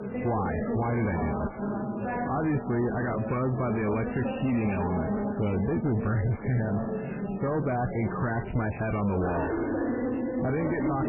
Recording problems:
distortion; heavy; 5 dB below the speech
garbled, watery; badly; nothing above 2.5 kHz
background chatter; loud; throughout; 4 voices, 3 dB below the speech

